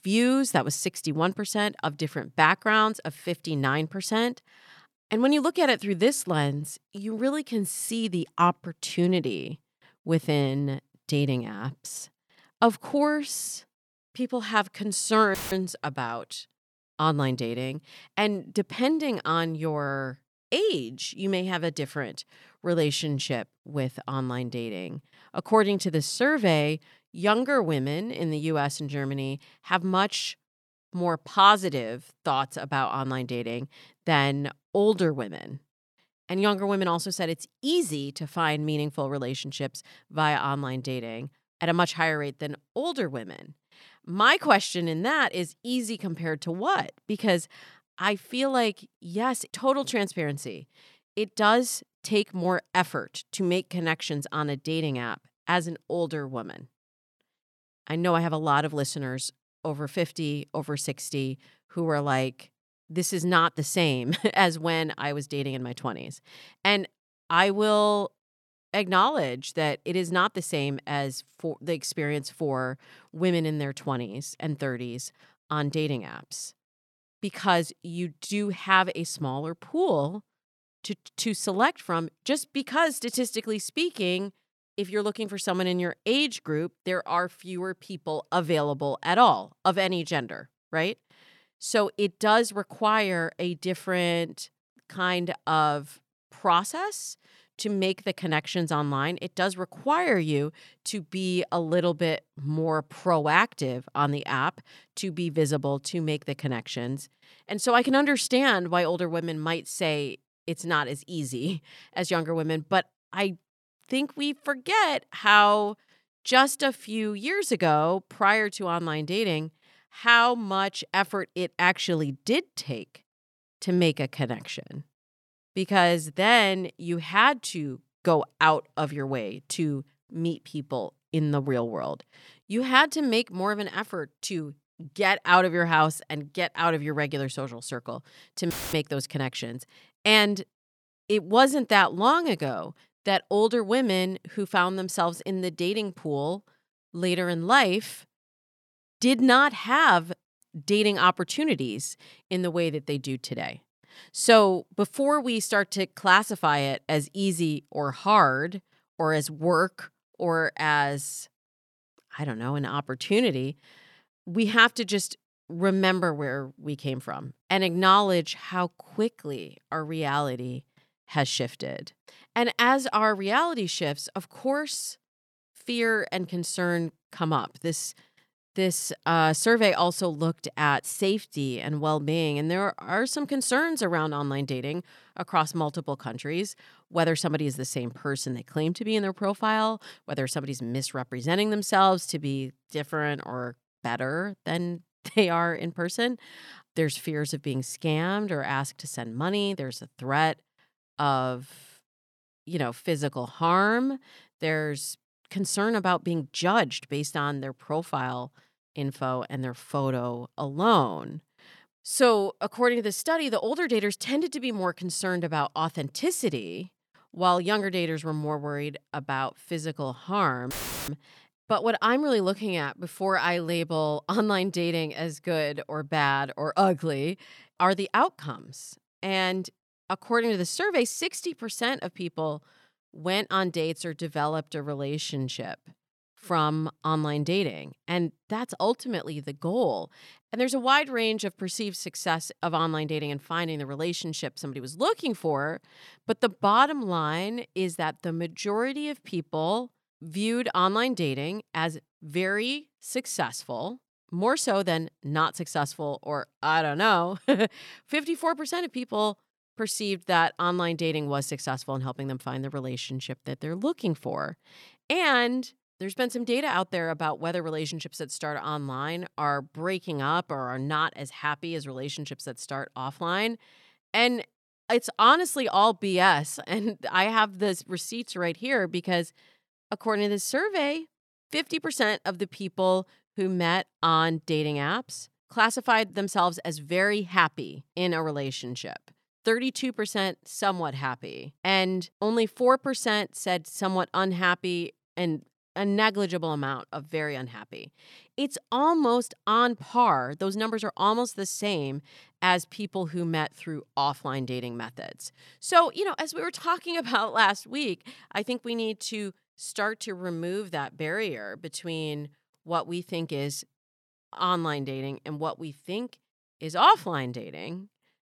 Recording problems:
audio cutting out; filled with static; at 15 s, at 2:19 and at 3:41

